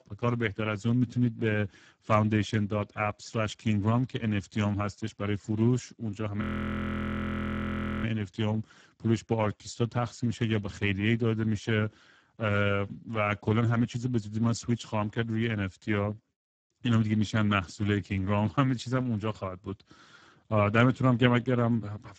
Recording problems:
garbled, watery; badly; nothing above 7.5 kHz
audio freezing; at 6.5 s for 1.5 s

